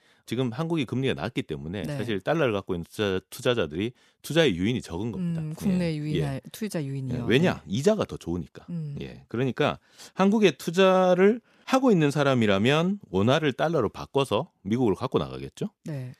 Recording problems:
none

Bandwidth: 14.5 kHz